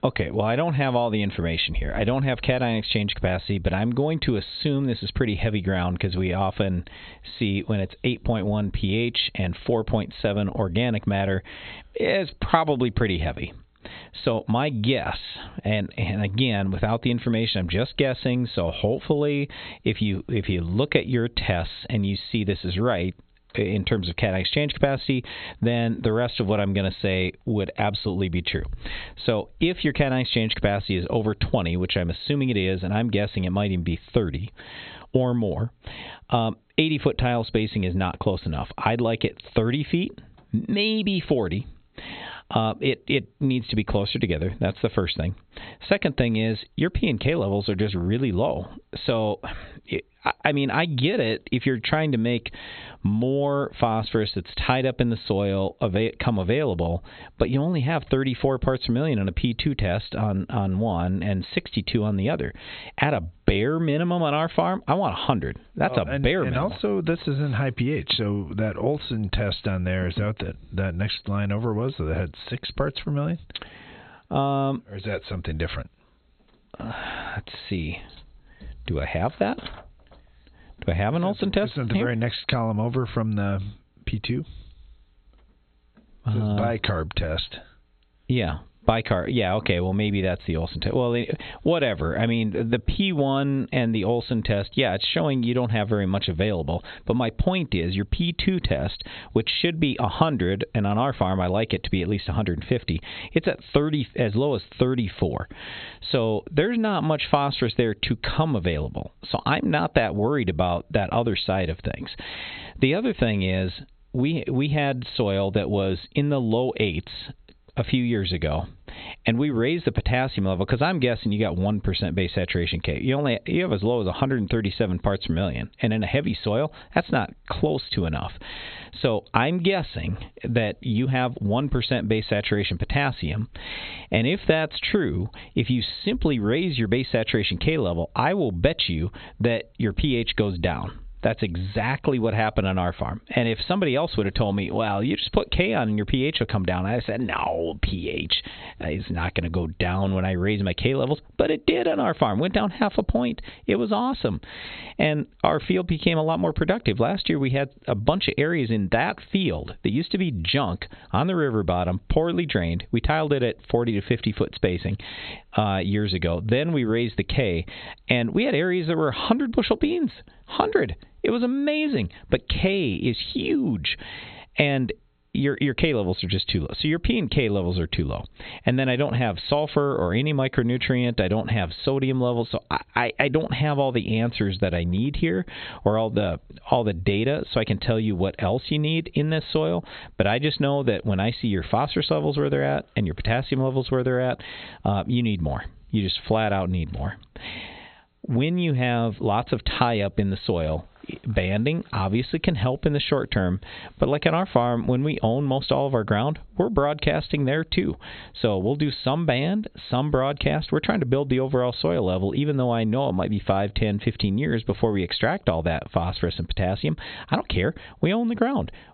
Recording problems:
high frequencies cut off; severe; nothing above 4 kHz
squashed, flat; heavily

